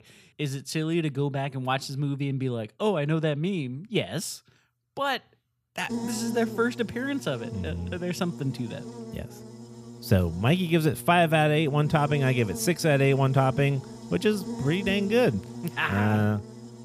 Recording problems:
electrical hum; noticeable; from 6 s on; 60 Hz, 15 dB below the speech

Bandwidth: 15 kHz